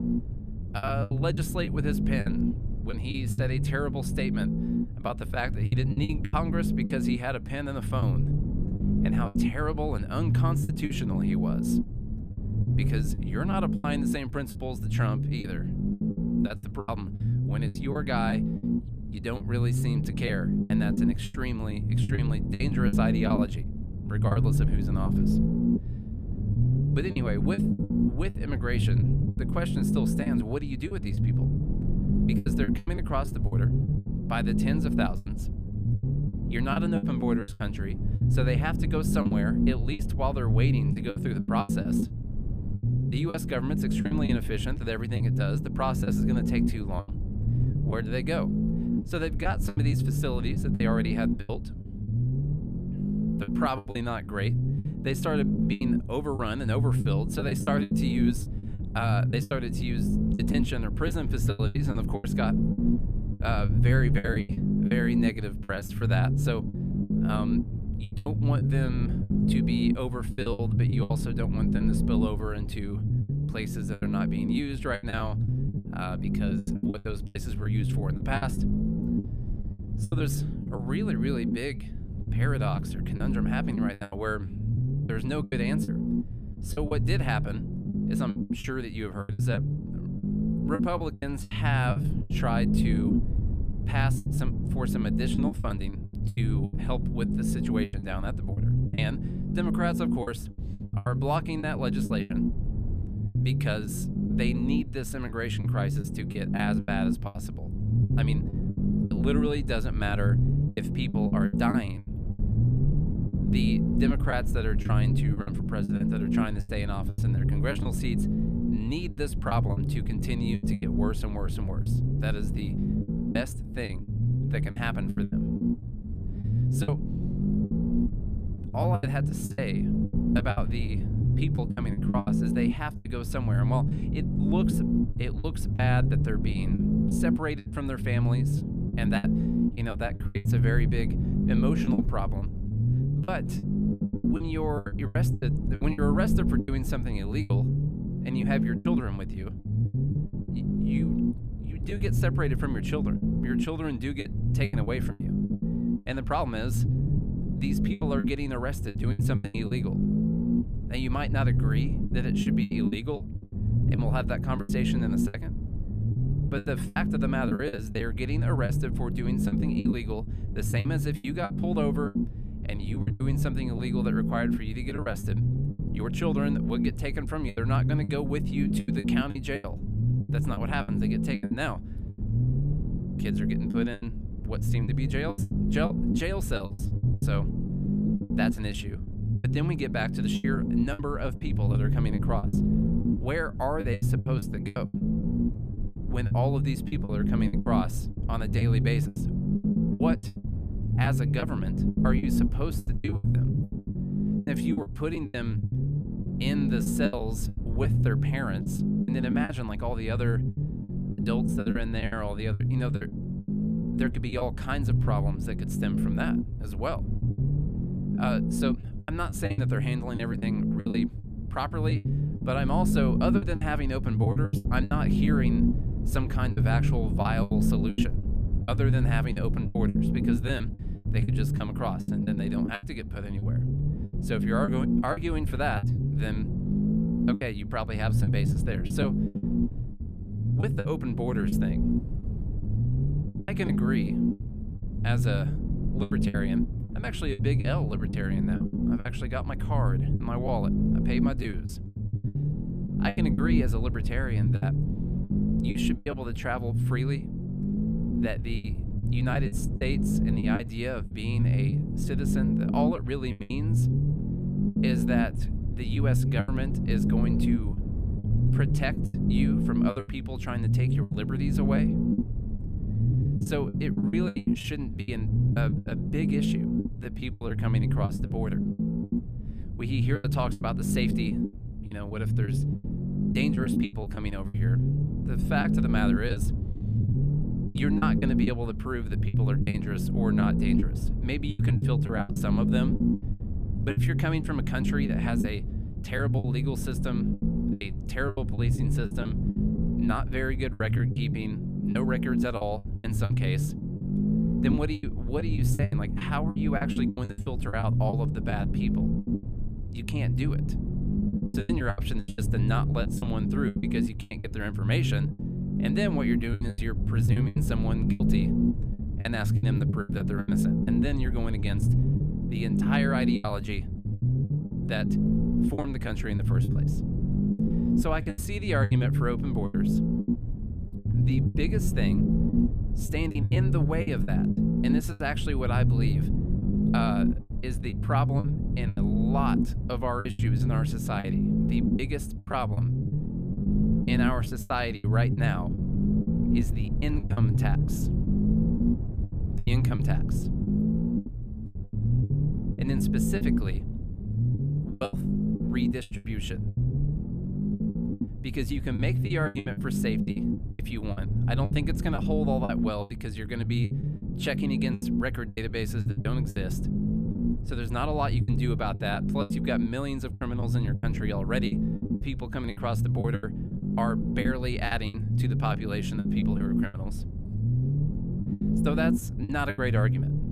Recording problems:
low rumble; loud; throughout; 2 dB below the speech
choppy; very; 11% of the speech affected

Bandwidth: 14.5 kHz